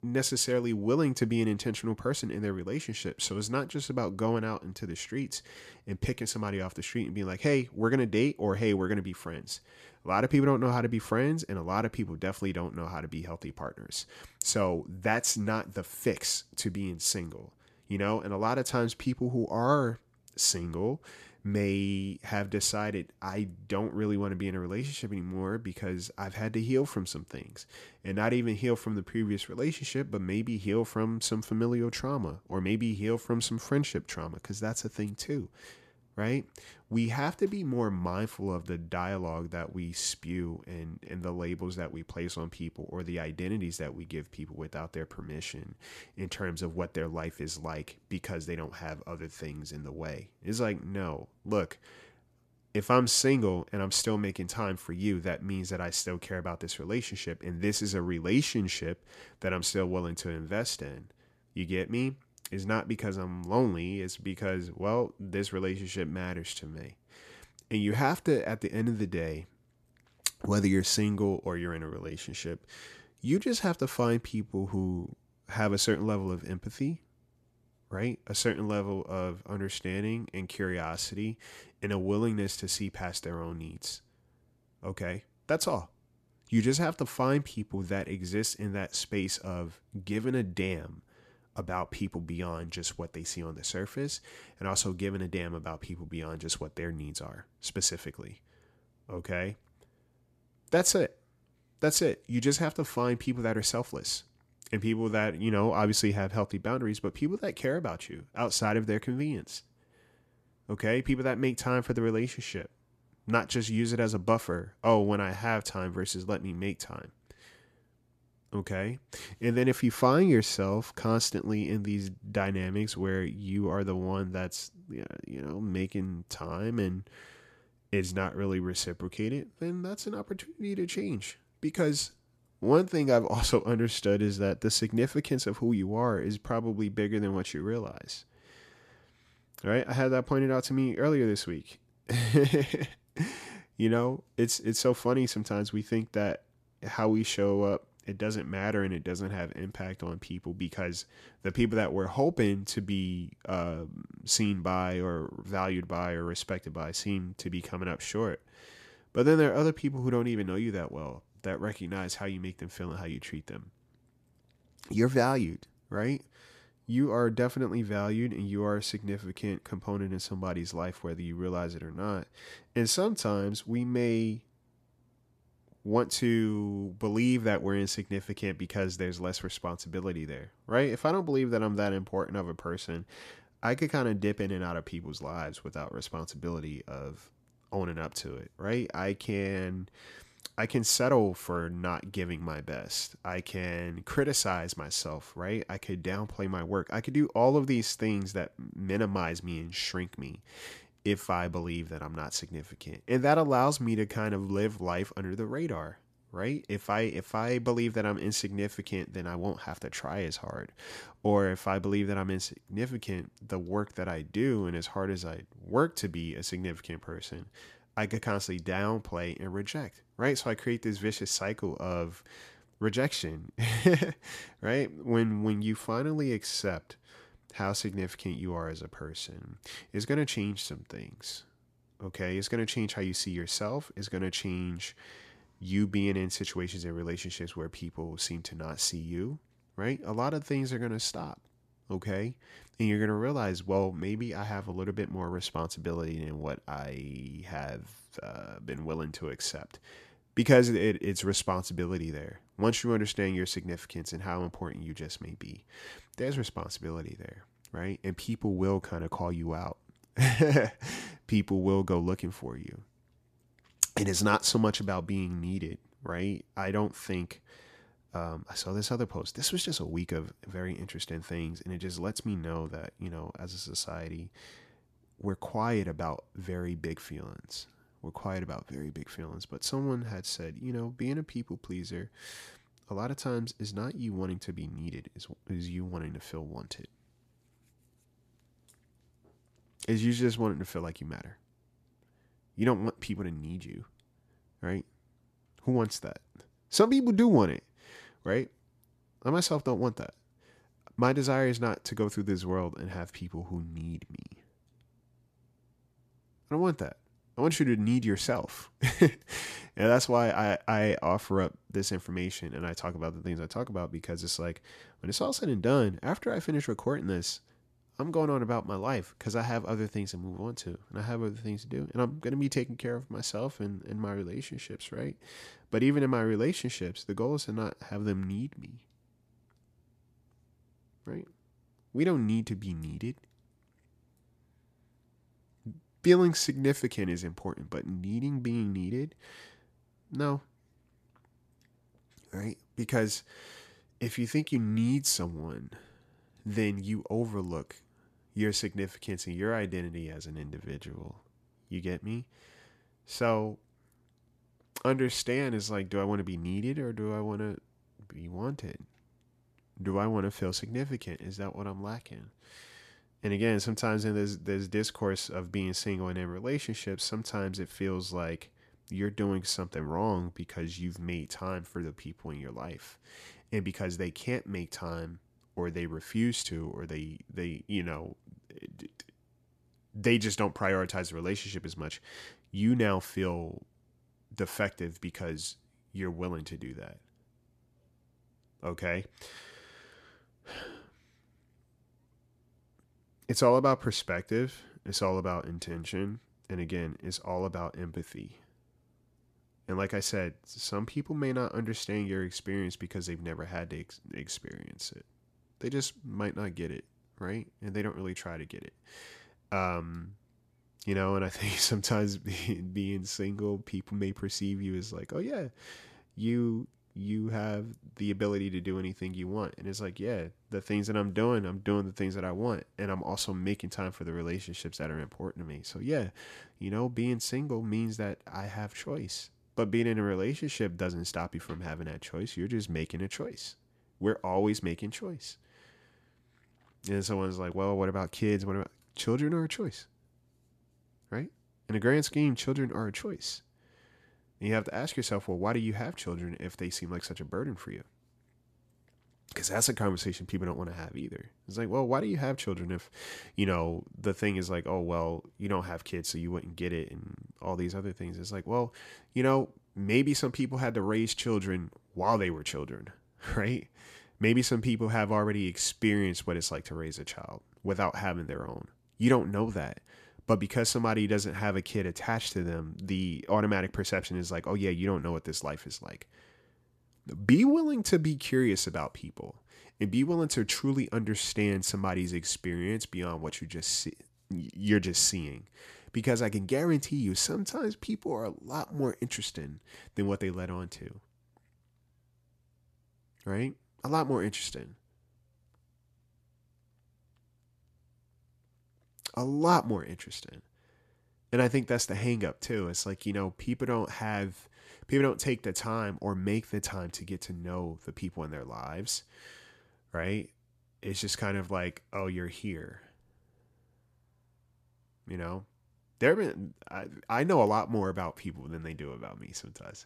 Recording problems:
none

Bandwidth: 14.5 kHz